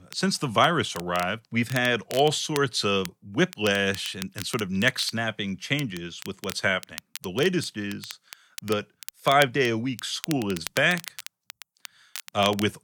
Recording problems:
crackle, like an old record; noticeable; 15 dB below the speech

